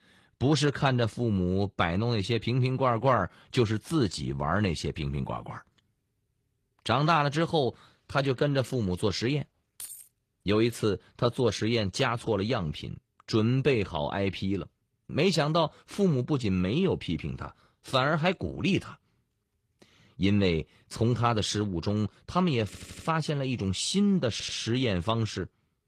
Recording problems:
garbled, watery; slightly; nothing above 14.5 kHz
jangling keys; faint; at 10 s; peak 15 dB below the speech
audio stuttering; at 23 s and at 24 s

